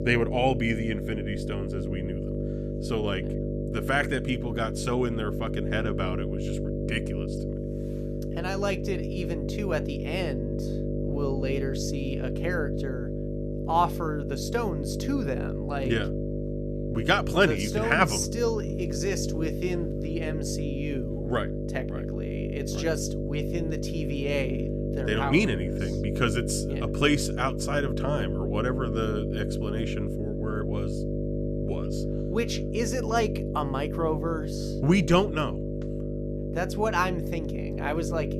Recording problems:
electrical hum; loud; throughout; 50 Hz, 6 dB below the speech

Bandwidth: 14.5 kHz